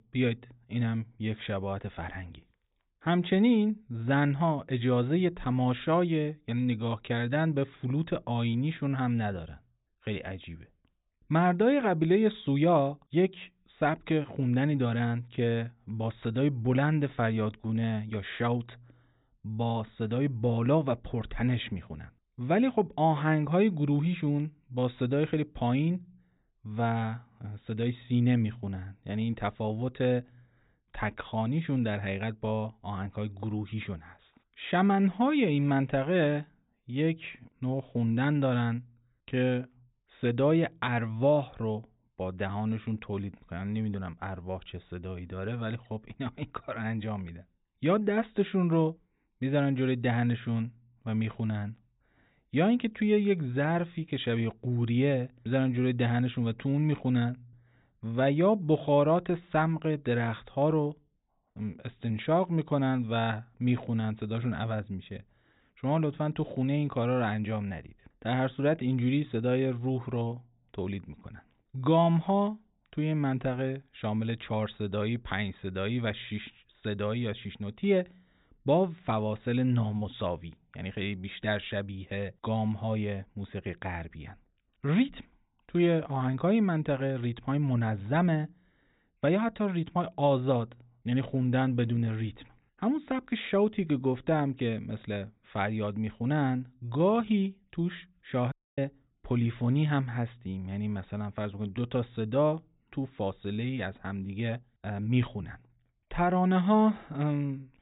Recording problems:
high frequencies cut off; severe; nothing above 4 kHz
audio cutting out; at 1:39

